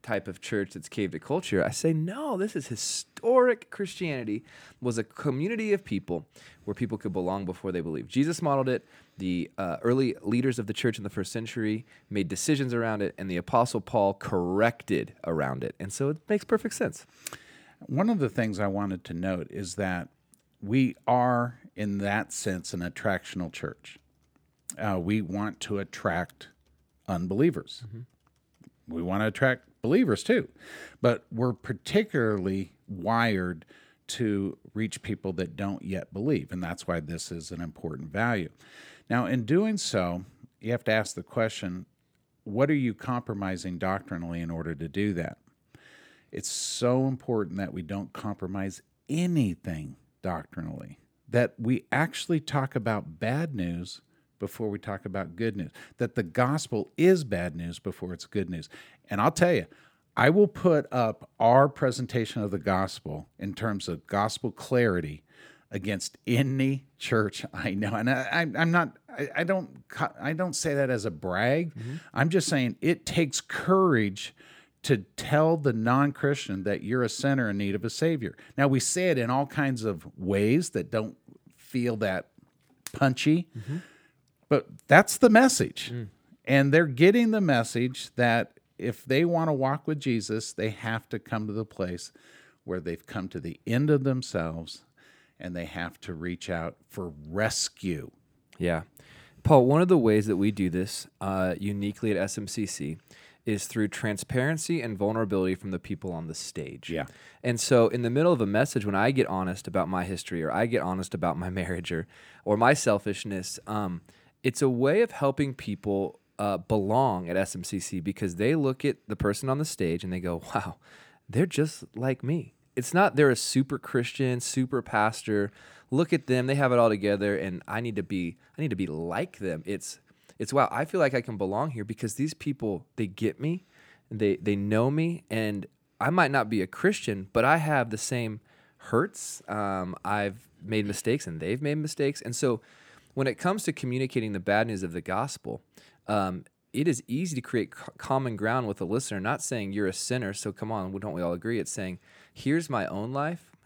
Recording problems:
none

